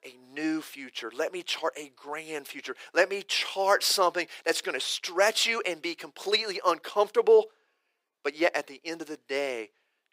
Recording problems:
thin; very; fading below 350 Hz

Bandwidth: 15.5 kHz